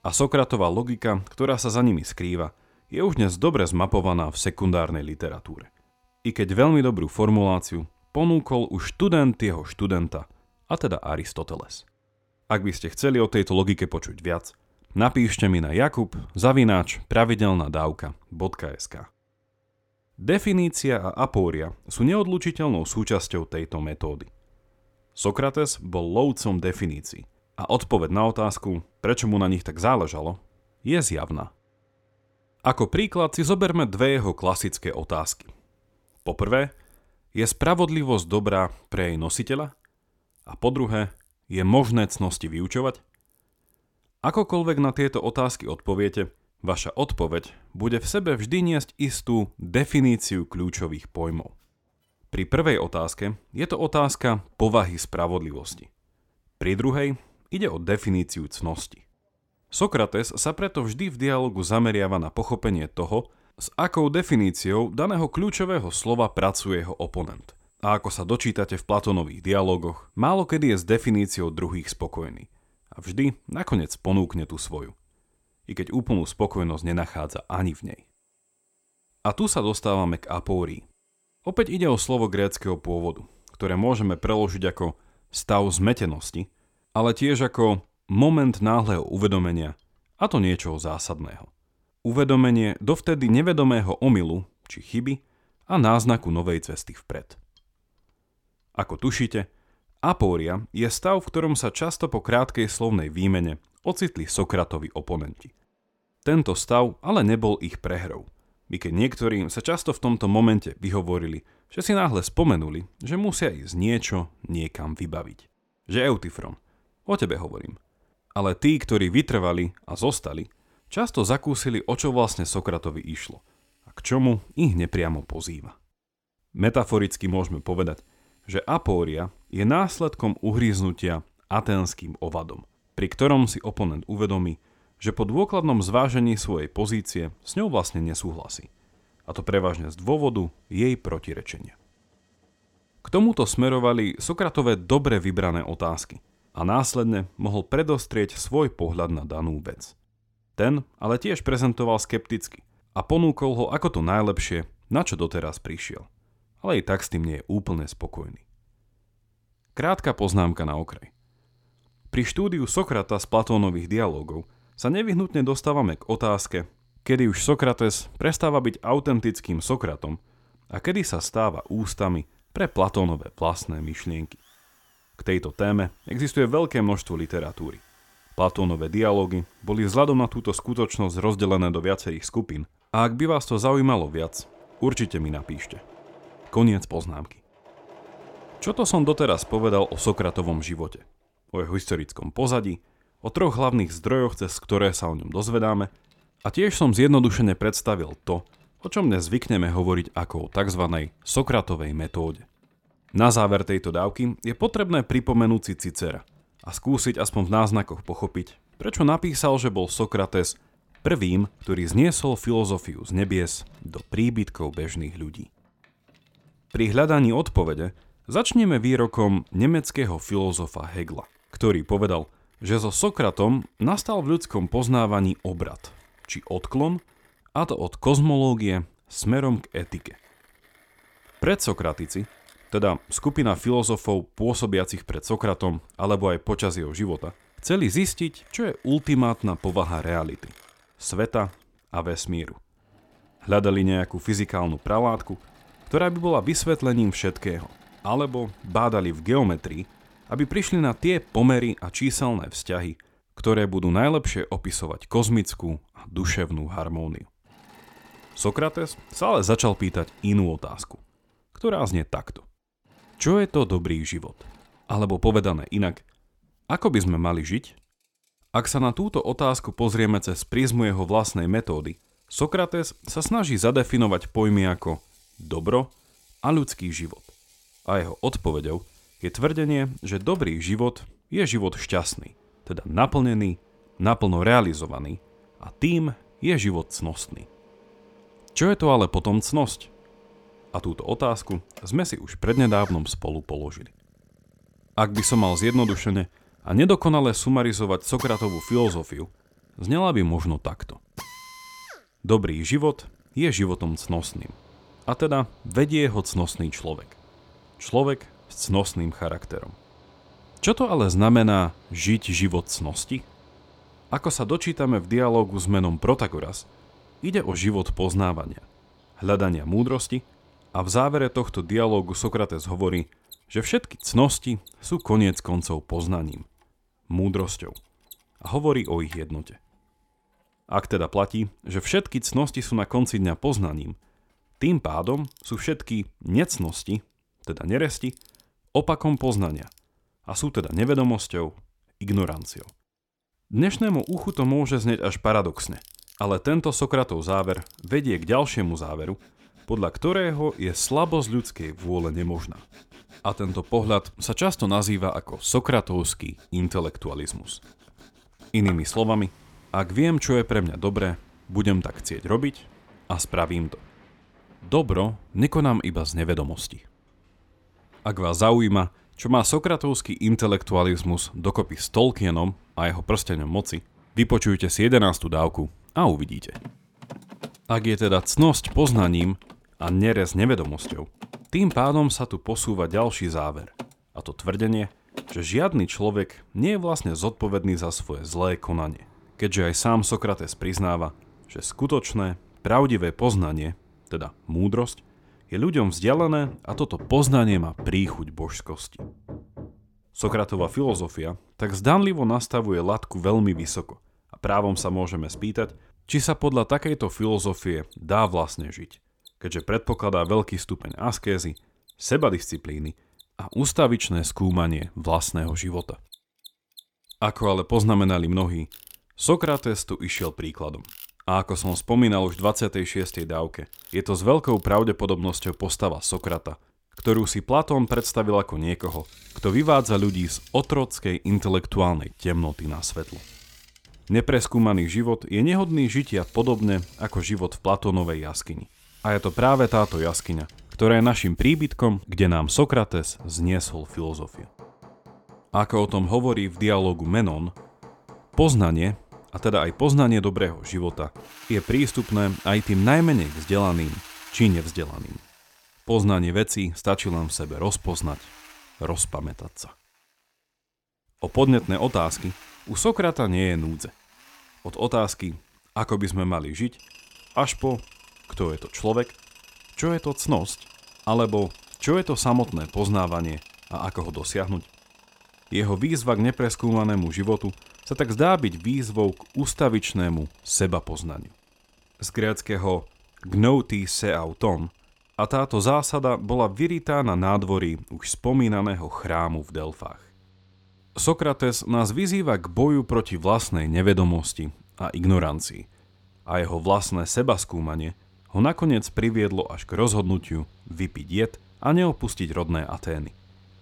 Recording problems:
machinery noise; faint; throughout; 25 dB below the speech

